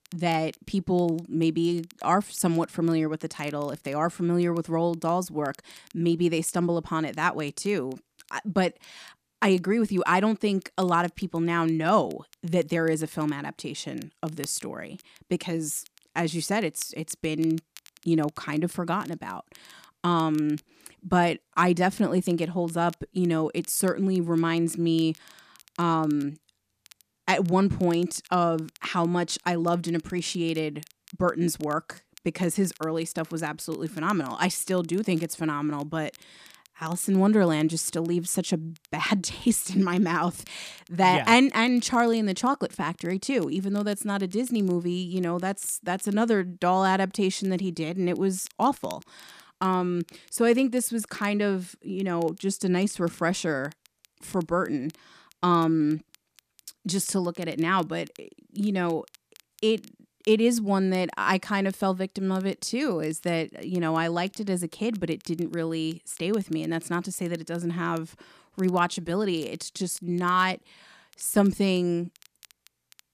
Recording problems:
crackle, like an old record; faint; 30 dB below the speech

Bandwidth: 14.5 kHz